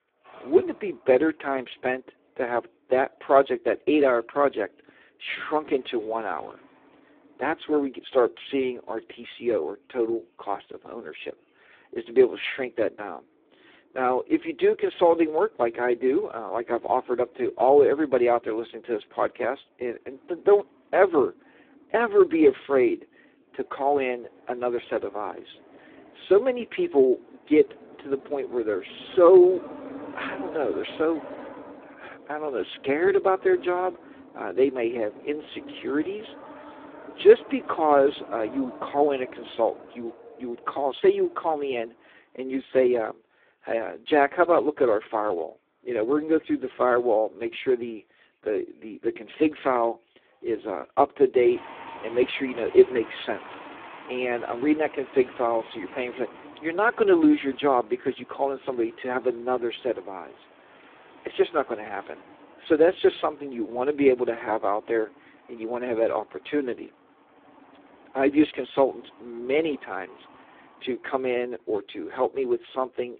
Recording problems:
phone-call audio; poor line
traffic noise; faint; throughout; 20 dB below the speech

